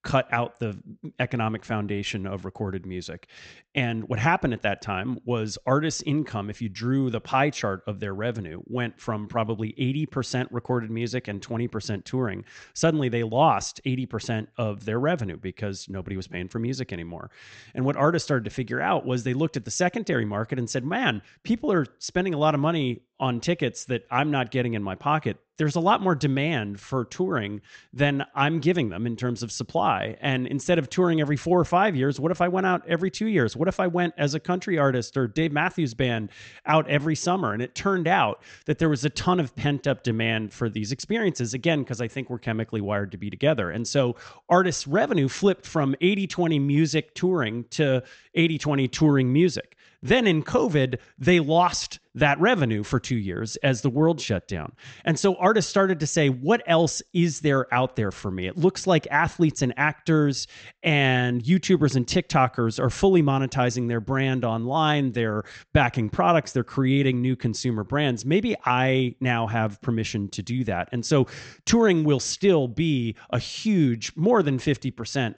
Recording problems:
high frequencies cut off; noticeable; nothing above 8 kHz

